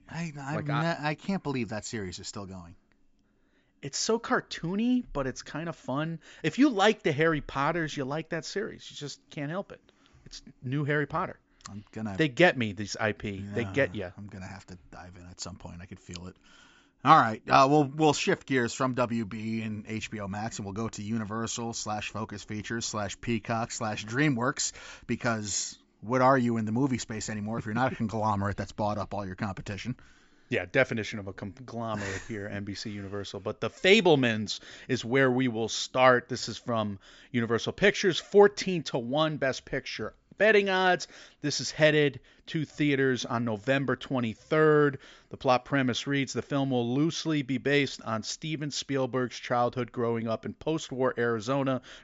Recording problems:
high frequencies cut off; noticeable; nothing above 7.5 kHz

